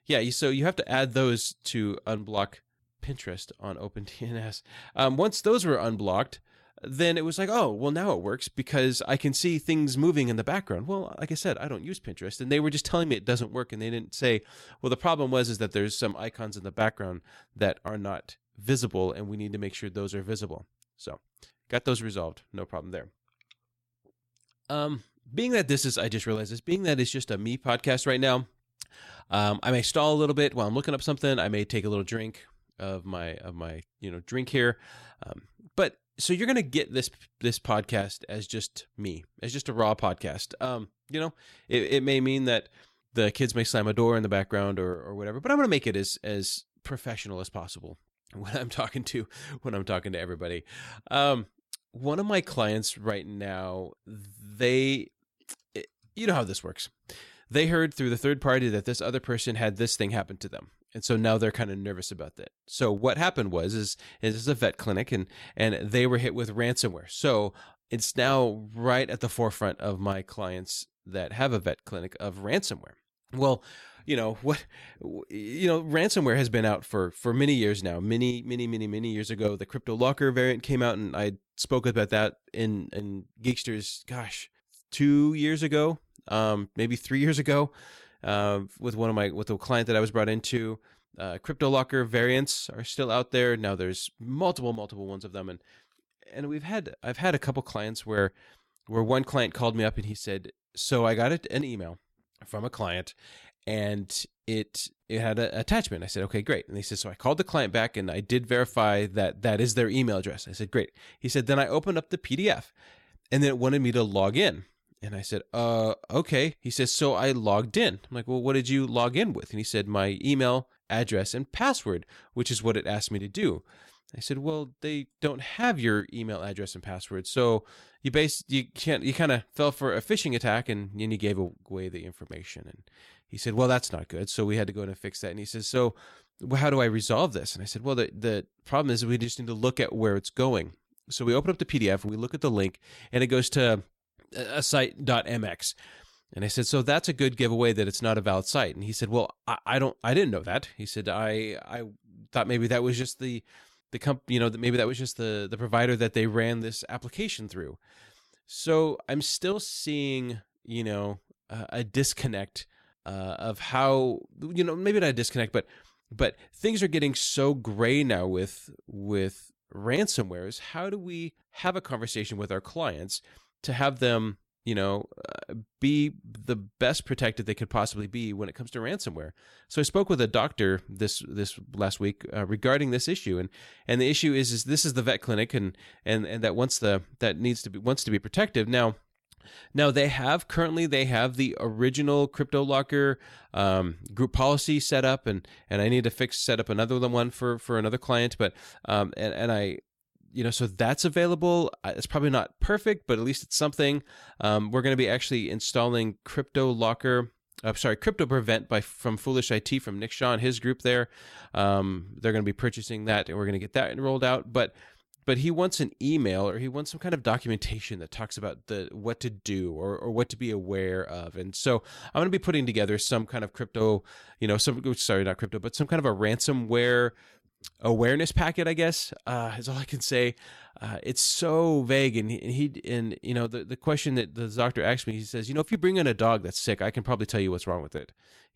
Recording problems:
none

